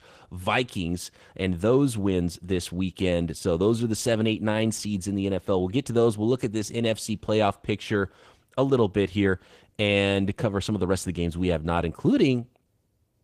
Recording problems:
garbled, watery; slightly; nothing above 15 kHz

